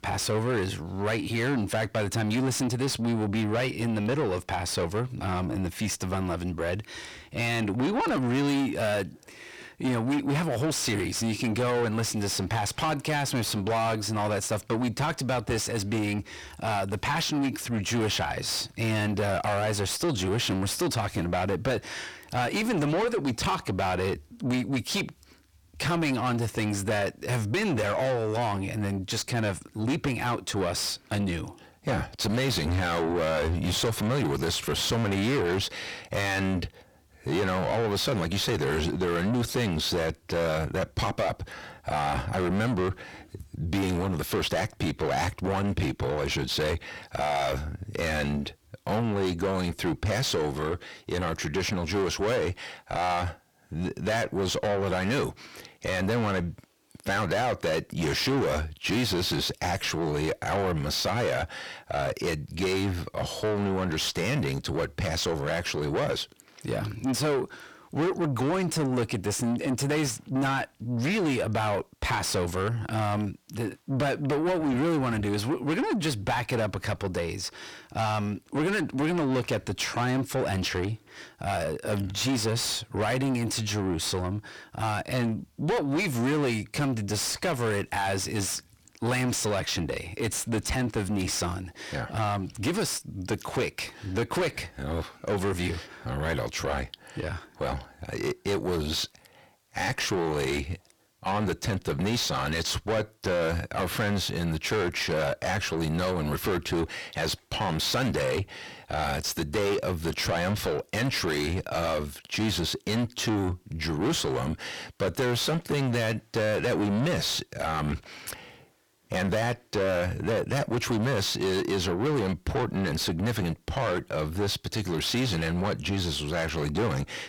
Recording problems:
distortion; heavy; 6 dB below the speech

